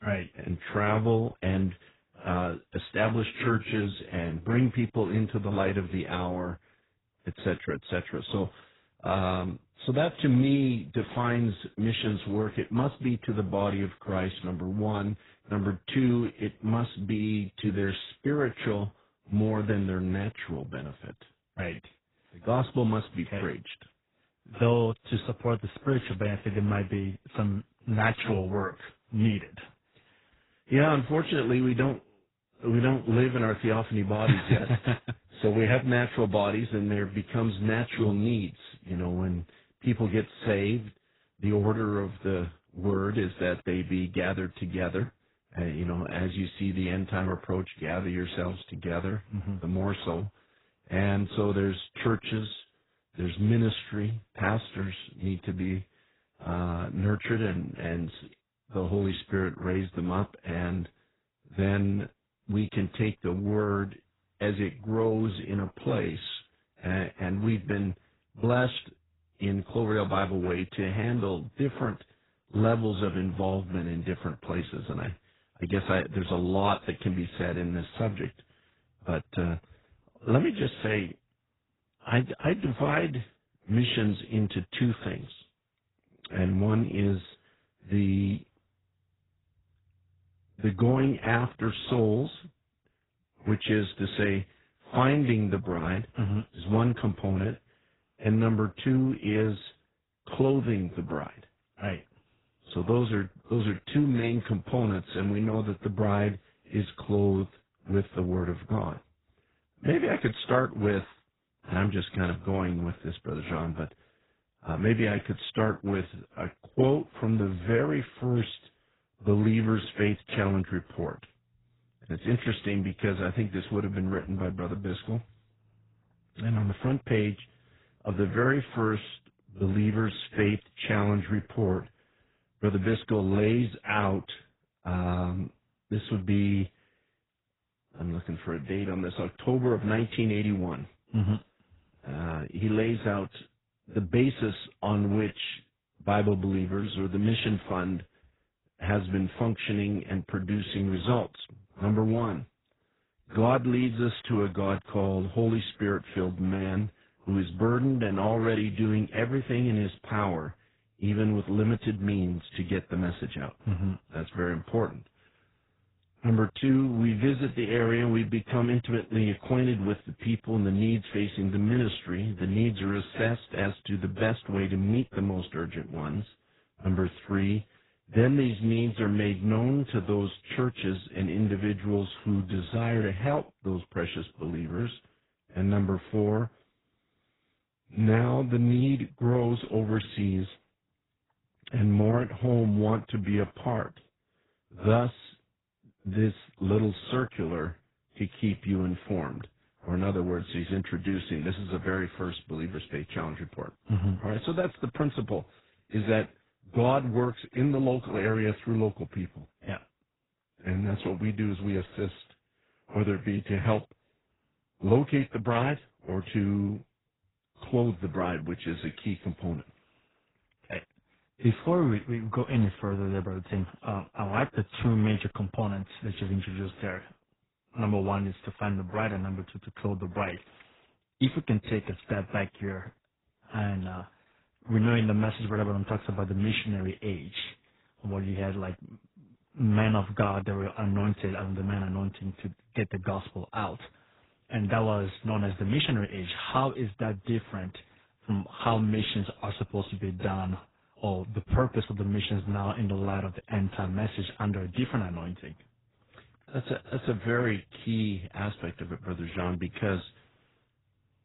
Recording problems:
garbled, watery; badly; nothing above 4 kHz

